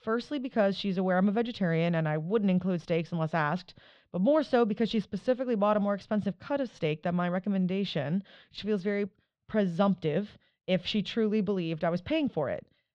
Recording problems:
muffled; slightly; fading above 3.5 kHz

